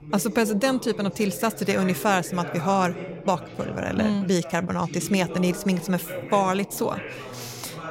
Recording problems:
background chatter; noticeable; throughout; 4 voices, 10 dB below the speech

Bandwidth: 16 kHz